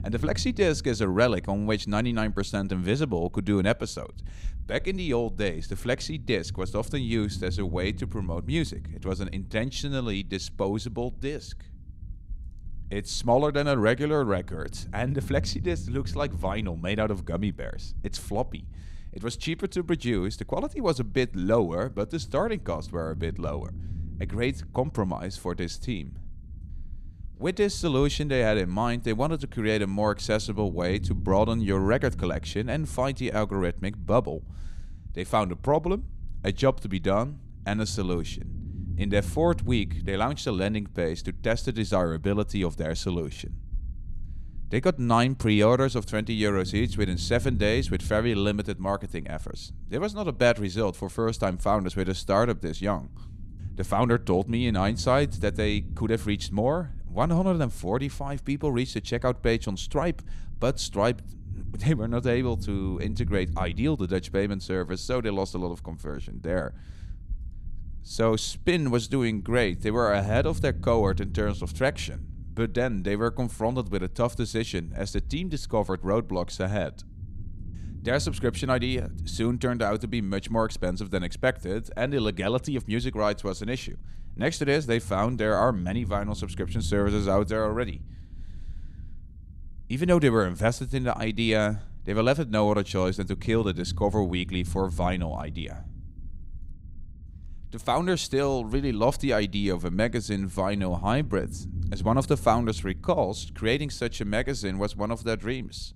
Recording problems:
low rumble; faint; throughout; 25 dB below the speech

